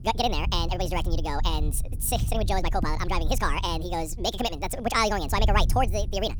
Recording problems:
wrong speed and pitch; too fast and too high; 1.7 times normal speed
low rumble; faint; throughout; 20 dB below the speech

